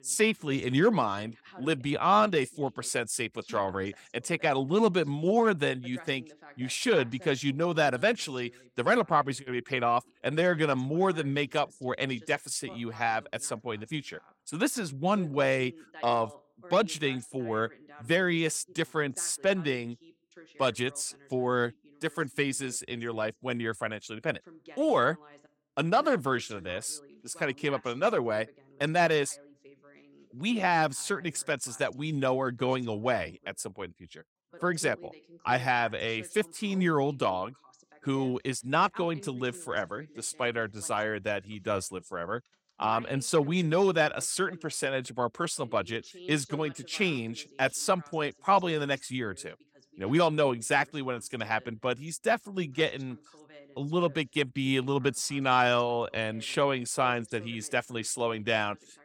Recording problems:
voice in the background; faint; throughout; 25 dB below the speech

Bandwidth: 17 kHz